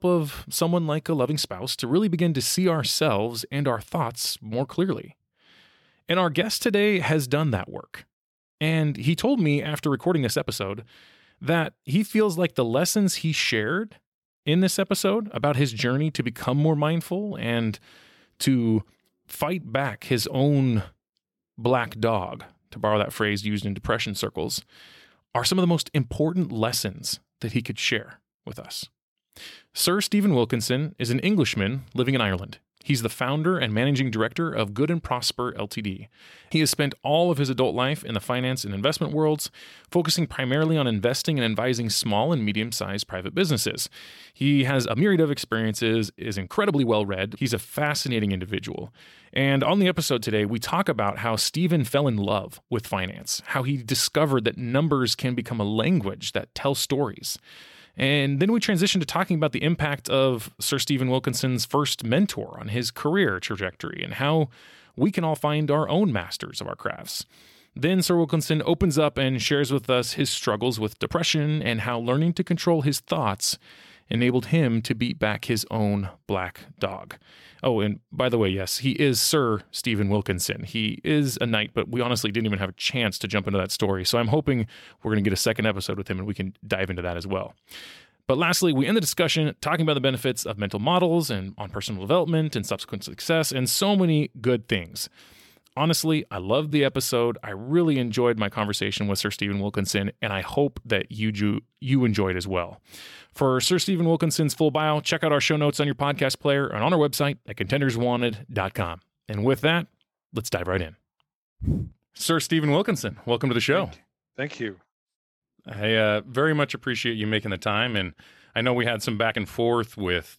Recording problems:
uneven, jittery; strongly; from 1 s to 1:59

